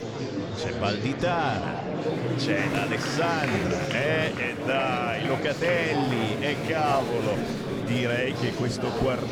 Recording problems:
murmuring crowd; loud; throughout; 1 dB below the speech

